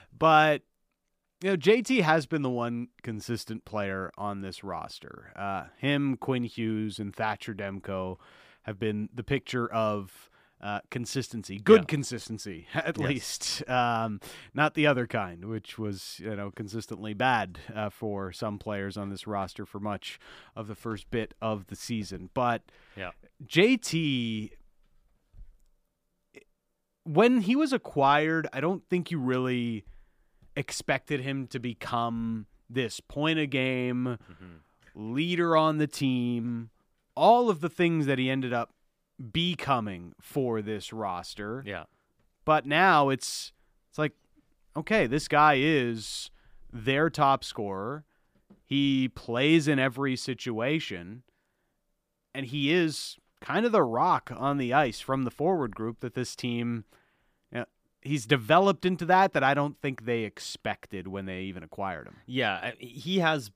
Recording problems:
none

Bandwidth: 15 kHz